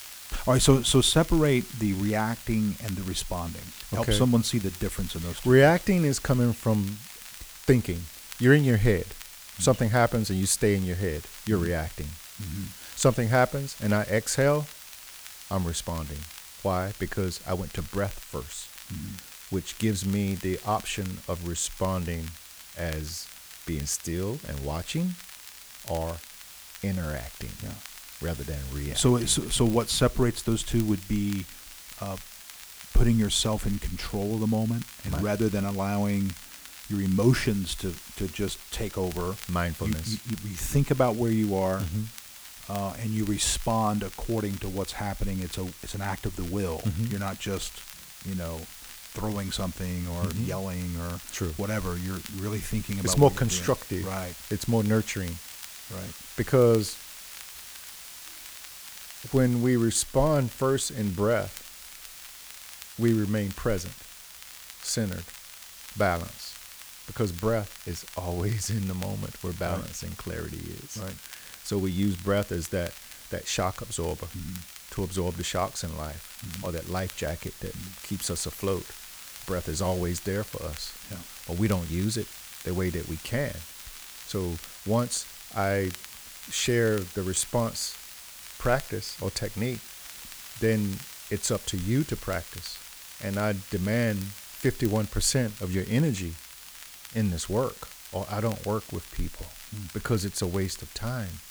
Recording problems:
hiss; noticeable; throughout; 15 dB below the speech
crackle, like an old record; noticeable; 20 dB below the speech

